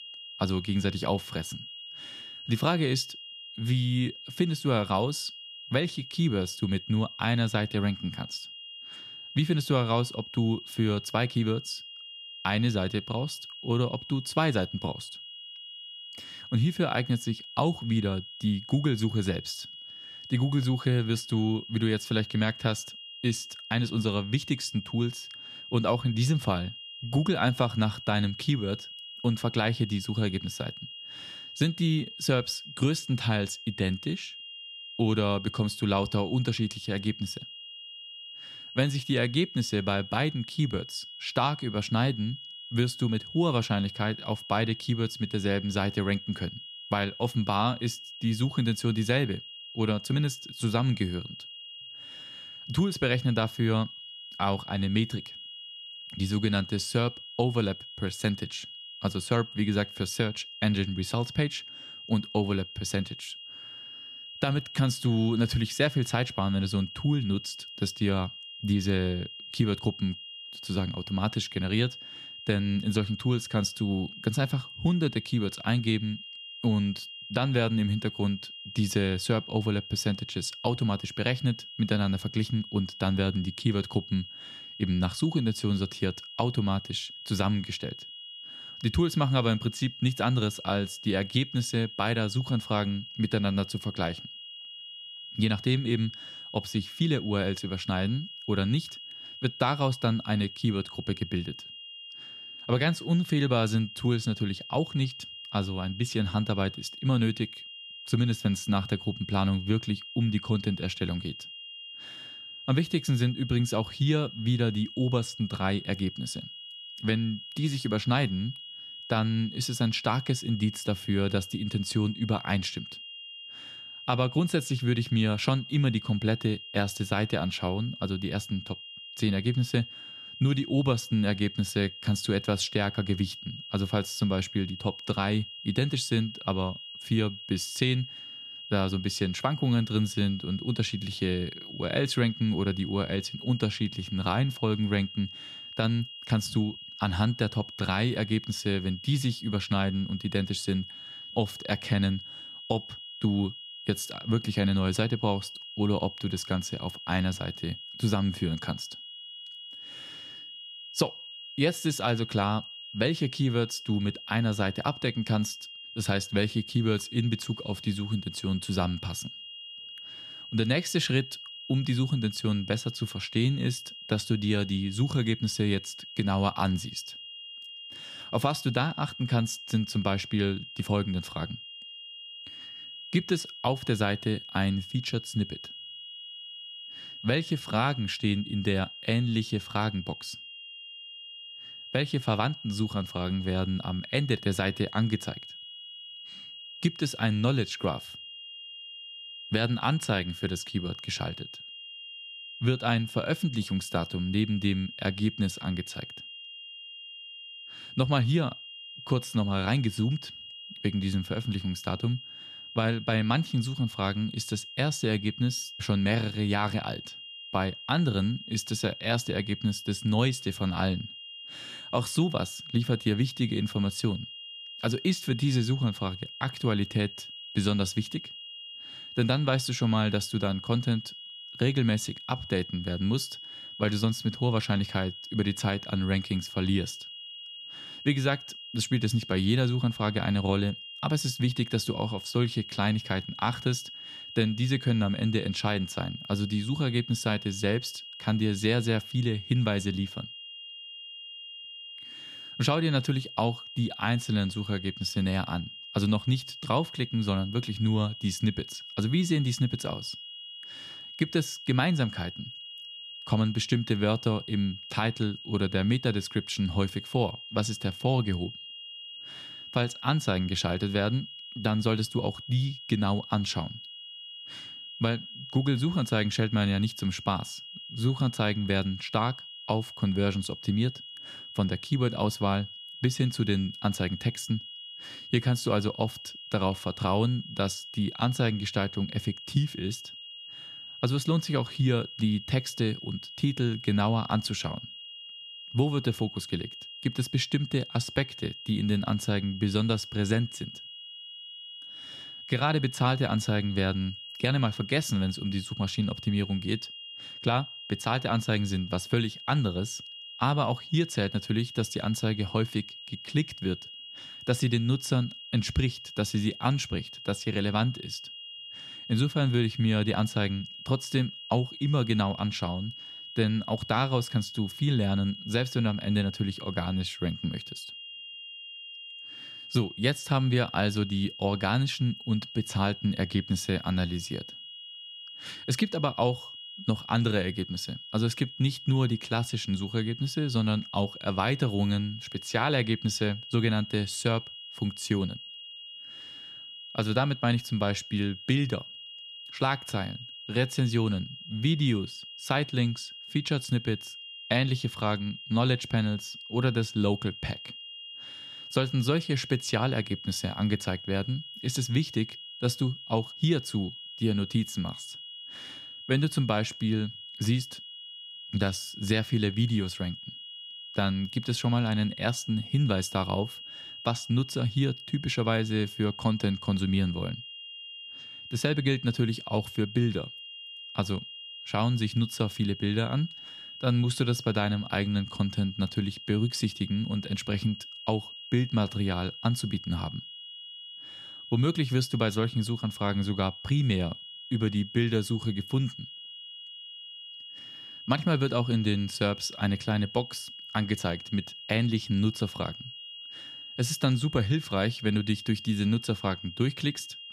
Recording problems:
high-pitched whine; noticeable; throughout; 3 kHz, 10 dB below the speech

